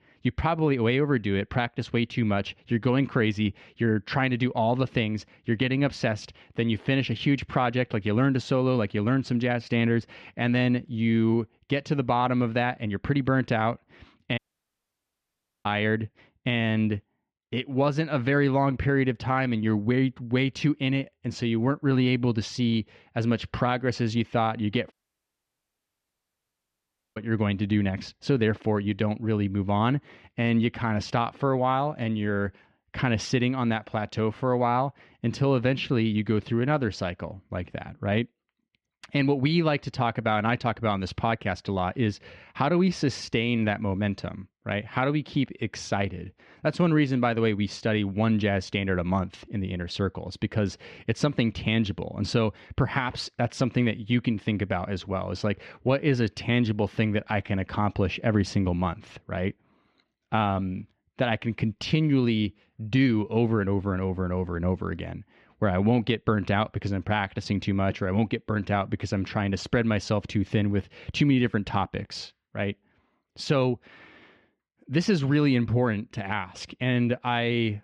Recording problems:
muffled; slightly; fading above 3 kHz
audio cutting out; at 14 s for 1.5 s and at 25 s for 2 s

